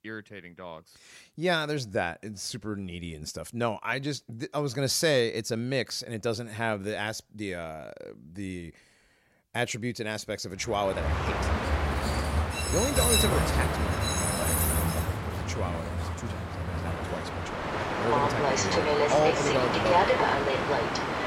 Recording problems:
train or aircraft noise; very loud; from 11 s on; 4 dB above the speech

